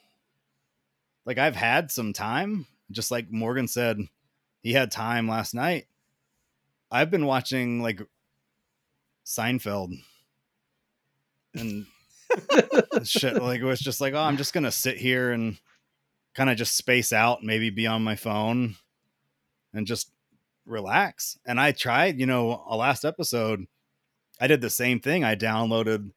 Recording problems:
none

